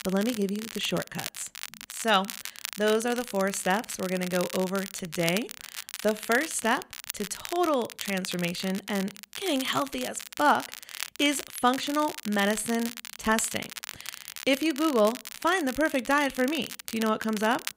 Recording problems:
crackle, like an old record; noticeable; 10 dB below the speech

